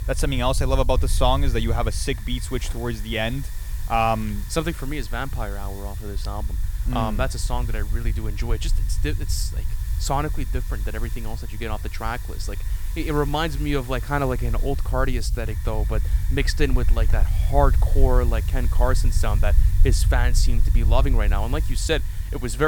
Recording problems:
hiss; noticeable; throughout; 15 dB below the speech
low rumble; noticeable; throughout; 20 dB below the speech
abrupt cut into speech; at the end

